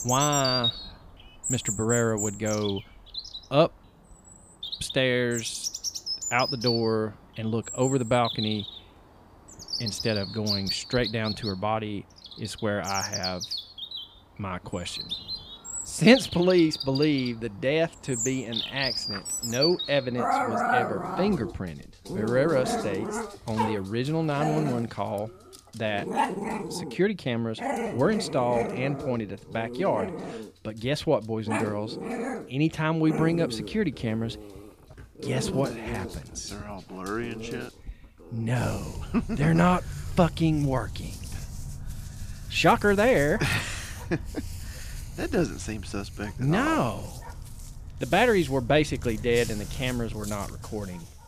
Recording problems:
animal sounds; loud; throughout; 6 dB below the speech

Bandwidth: 15 kHz